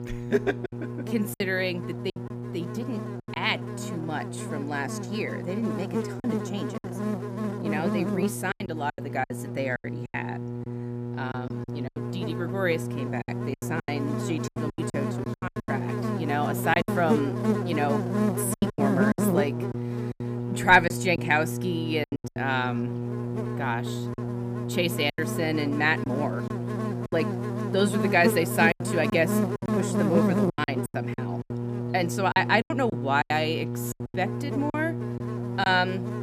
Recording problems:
electrical hum; loud; throughout; 60 Hz, 7 dB below the speech
choppy; very; 11% of the speech affected

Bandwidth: 15 kHz